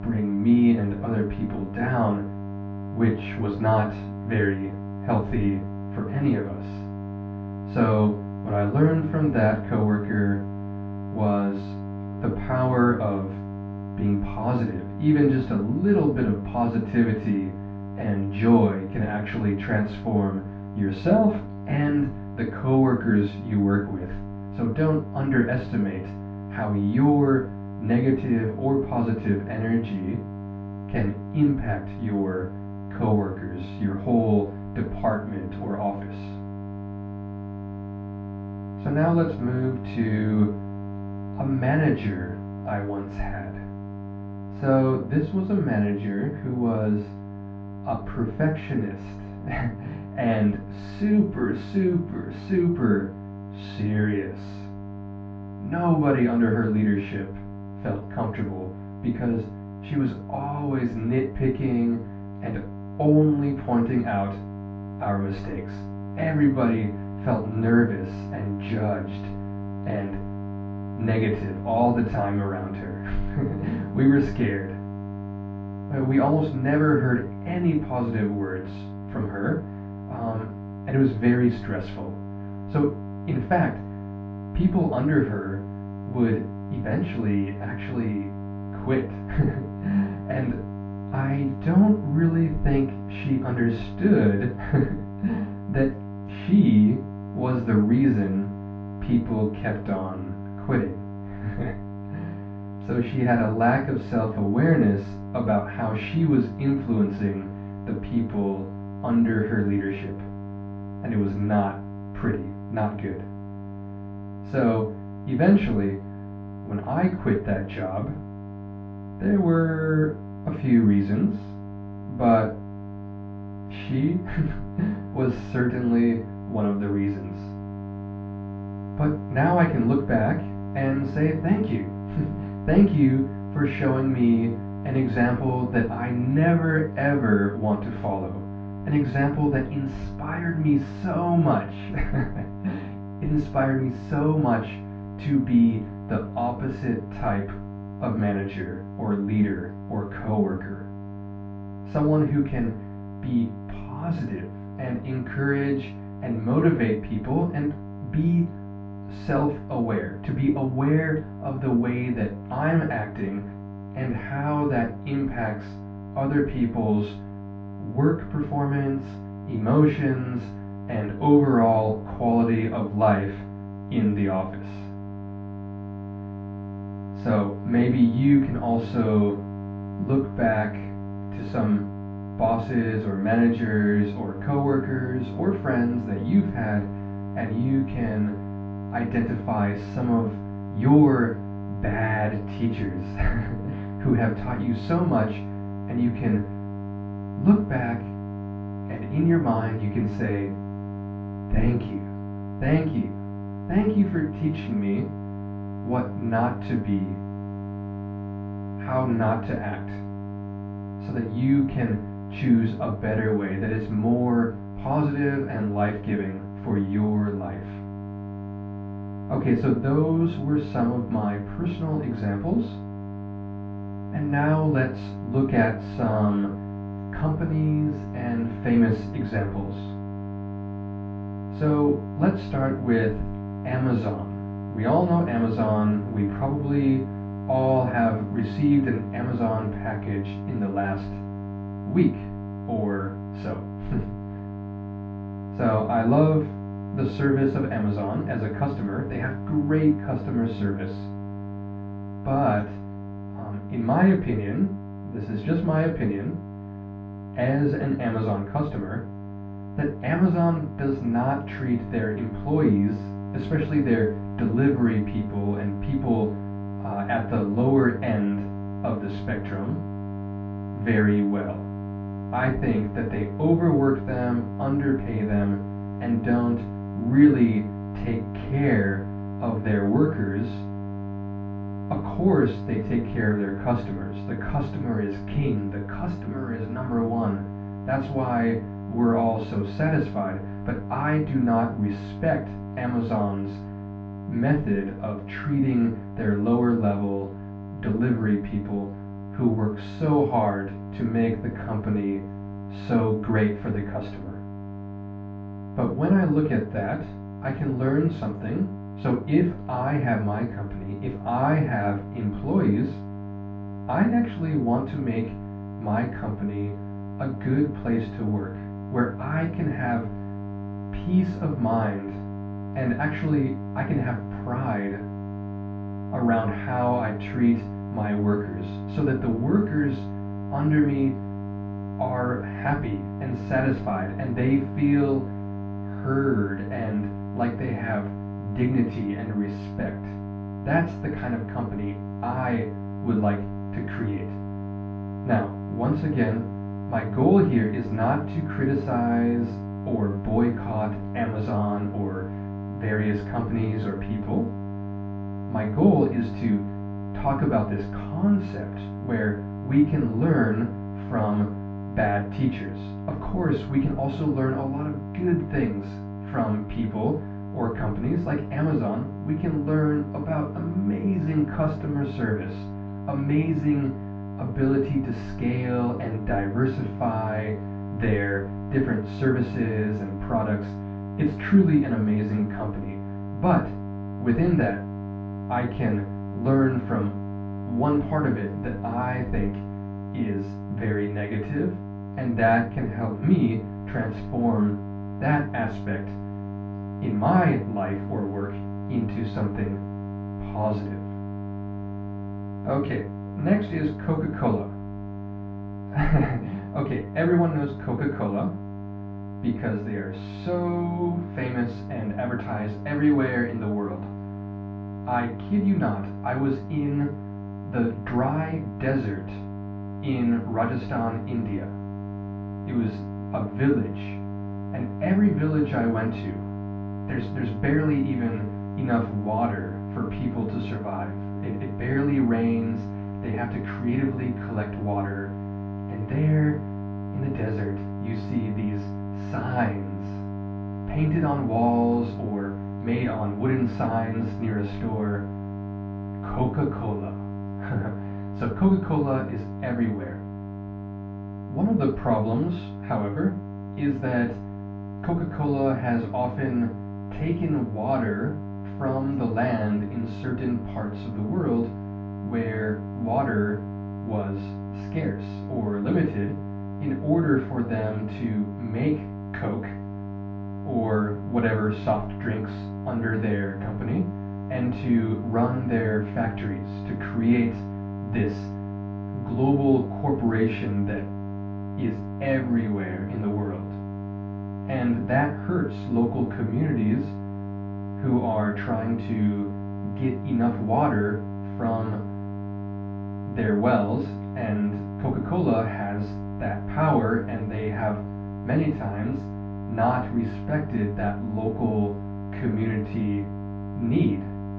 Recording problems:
off-mic speech; far
muffled; very; fading above 1.5 kHz
room echo; noticeable; dies away in 0.3 s
high frequencies cut off; slight; nothing above 8 kHz
electrical hum; noticeable; throughout; 50 Hz, 10 dB below the speech

